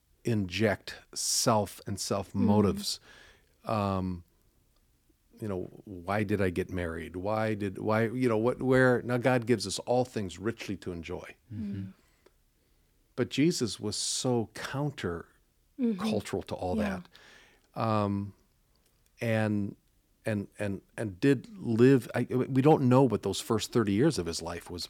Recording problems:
none

